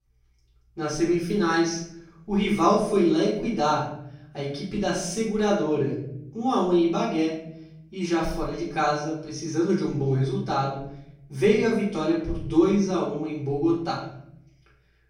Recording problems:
off-mic speech; far
room echo; noticeable; dies away in 0.6 s

